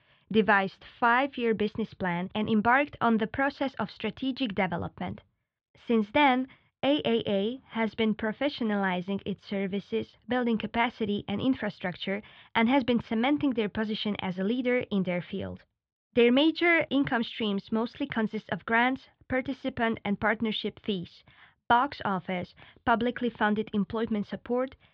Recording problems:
muffled; slightly; fading above 3.5 kHz

